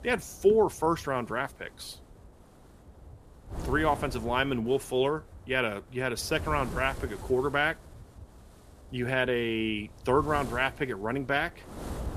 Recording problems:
wind noise on the microphone; occasional gusts; 20 dB below the speech

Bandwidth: 14.5 kHz